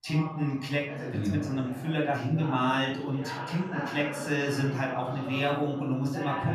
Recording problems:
room echo; slight; dies away in 0.5 s
off-mic speech; somewhat distant
voice in the background; loud; throughout; 10 dB below the speech

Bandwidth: 14.5 kHz